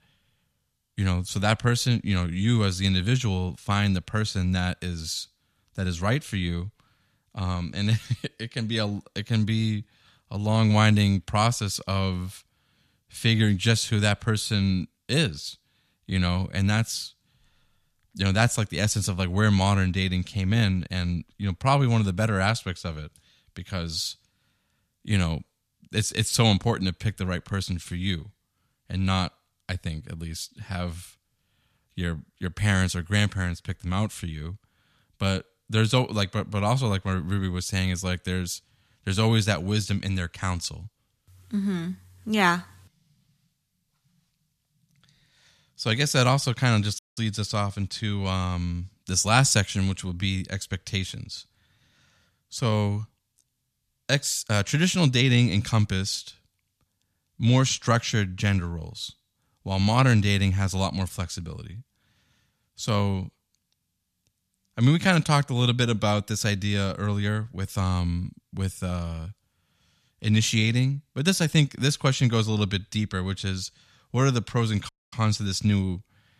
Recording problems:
audio cutting out; at 47 s and at 1:15

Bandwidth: 14.5 kHz